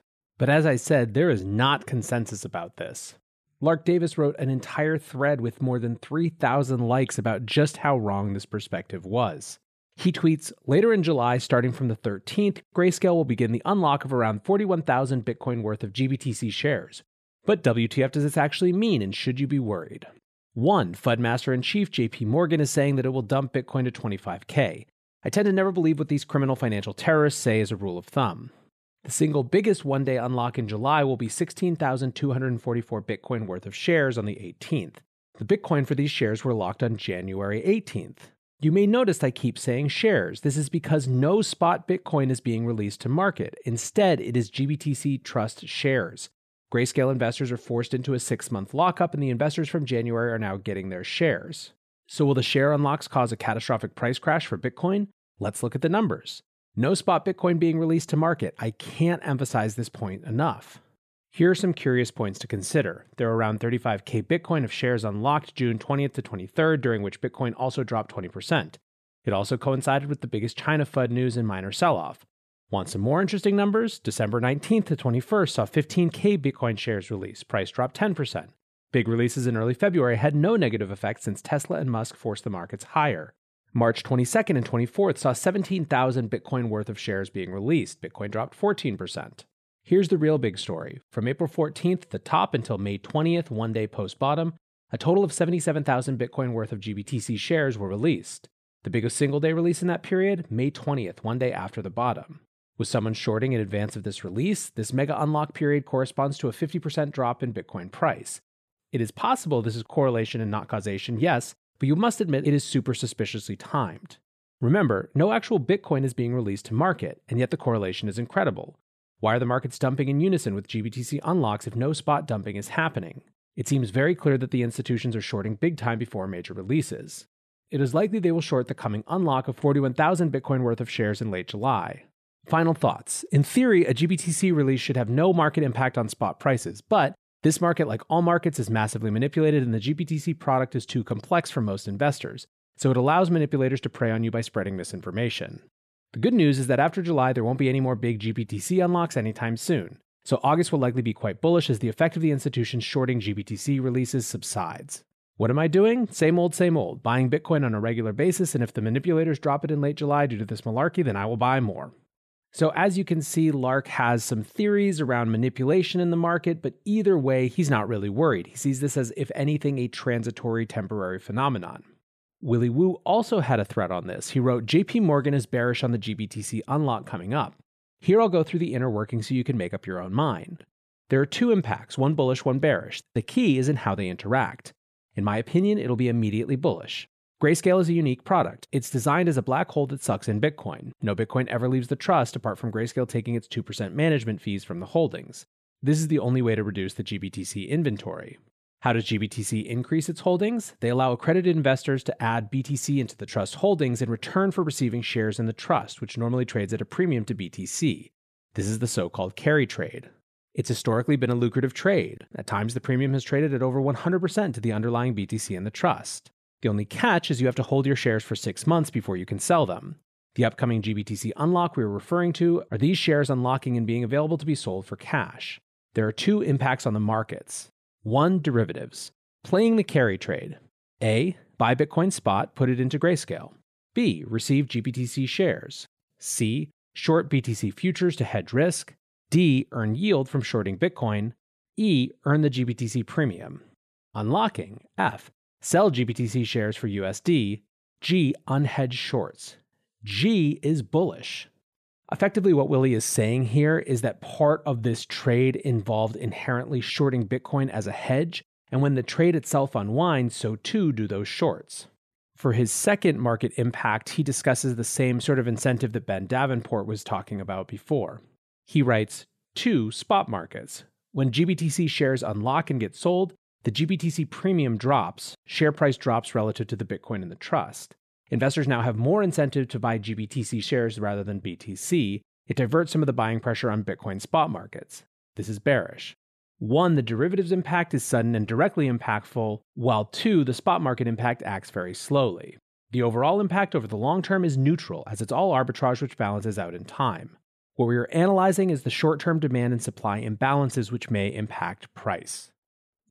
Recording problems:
none

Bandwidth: 14.5 kHz